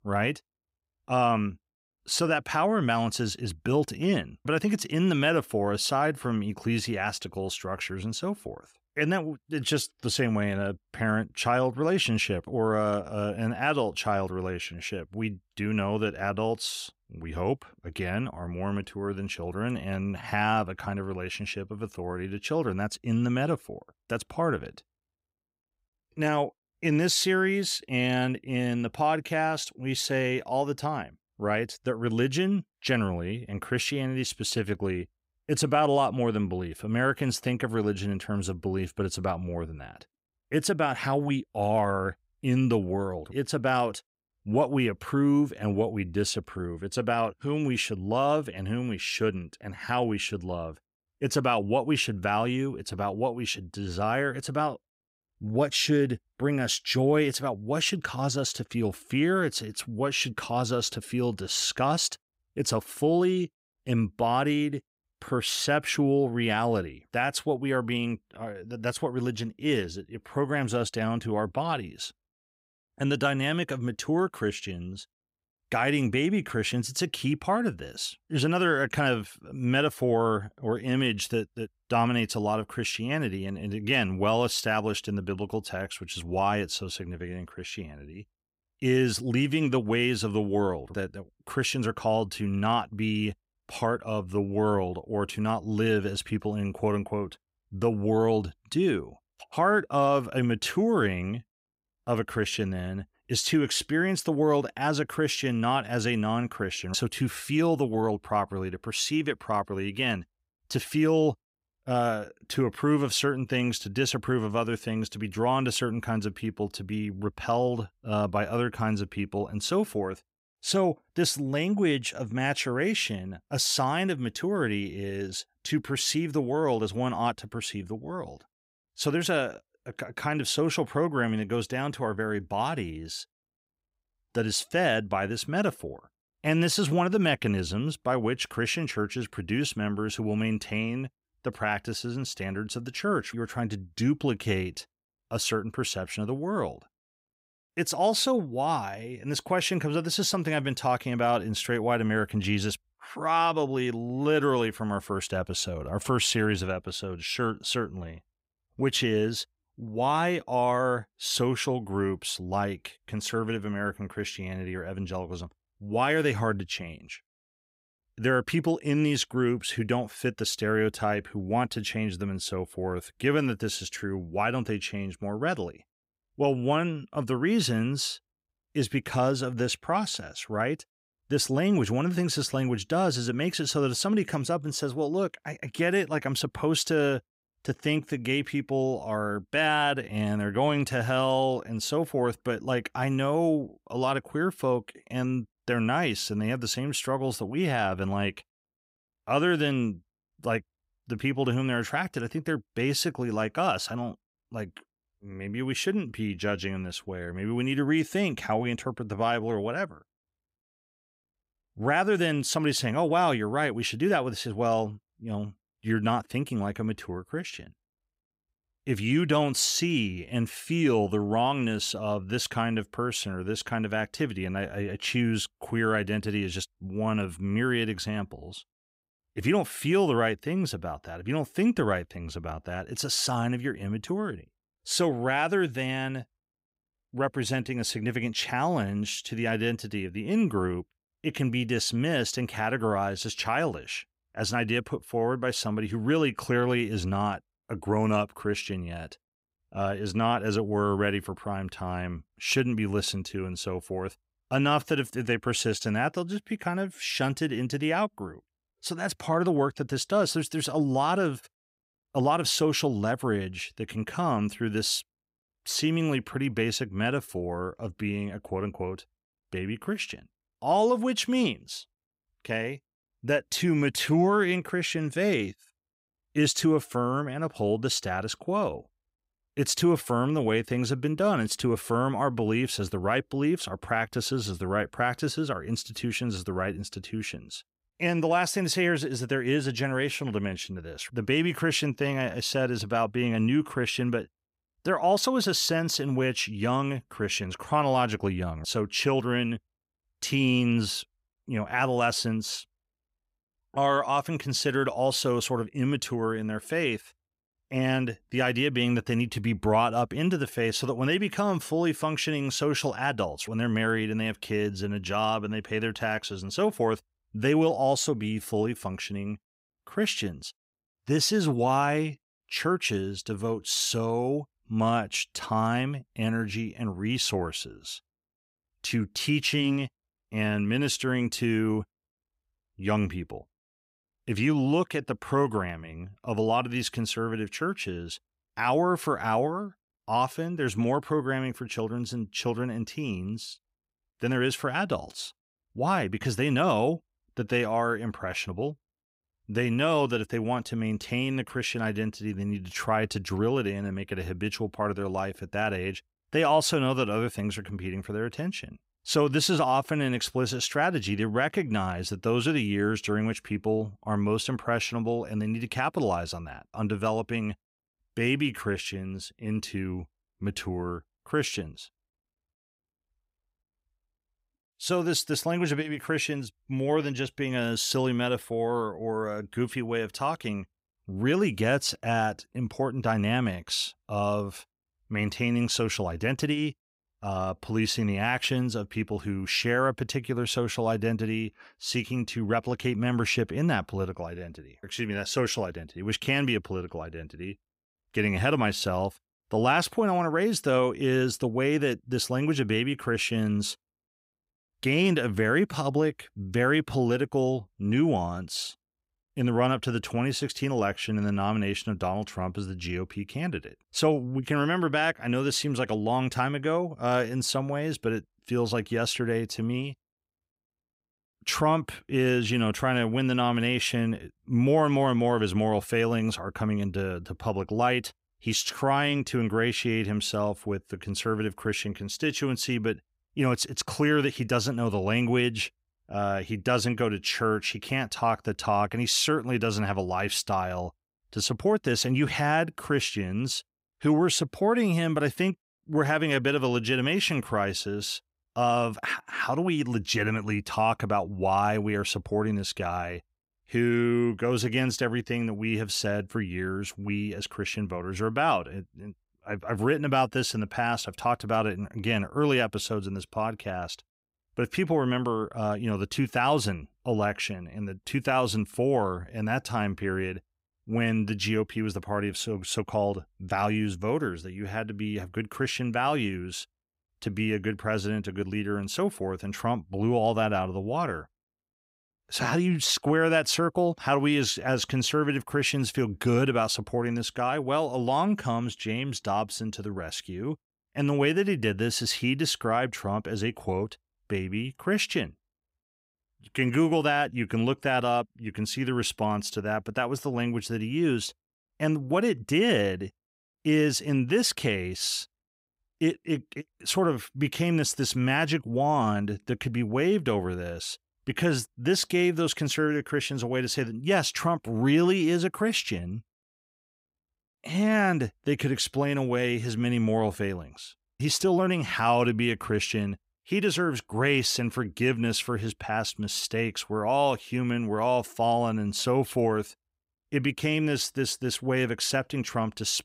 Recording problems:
none

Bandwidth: 15.5 kHz